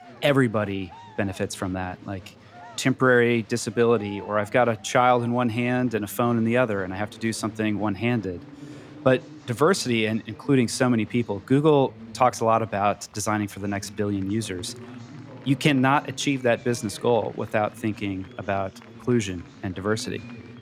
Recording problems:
chatter from many people; faint; throughout; 20 dB below the speech

